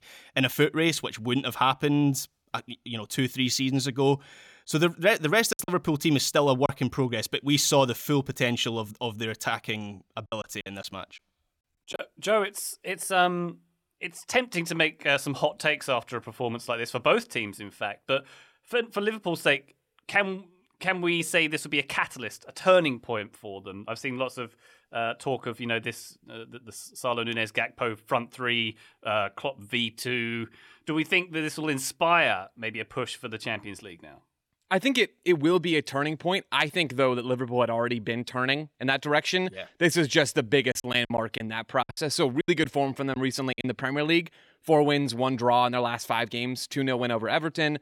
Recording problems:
choppy; very; from 5.5 to 6.5 s, from 10 to 12 s and from 41 to 44 s; 12% of the speech affected

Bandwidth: 18 kHz